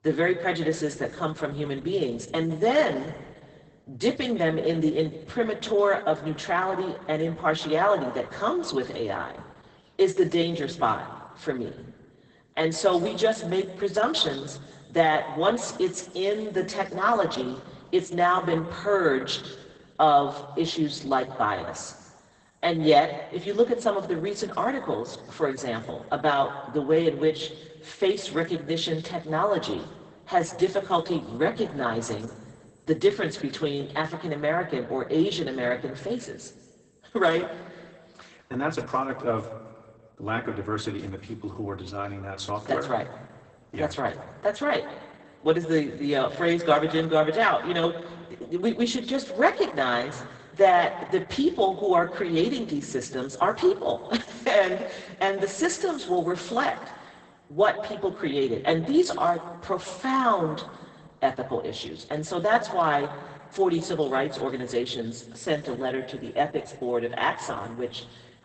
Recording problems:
garbled, watery; badly; nothing above 8 kHz
room echo; slight; dies away in 1.1 s
off-mic speech; somewhat distant

